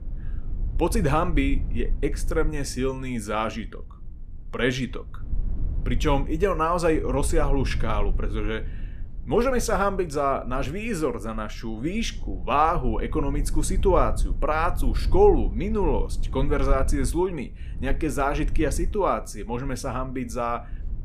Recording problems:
low rumble; faint; throughout; 25 dB below the speech

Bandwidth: 14.5 kHz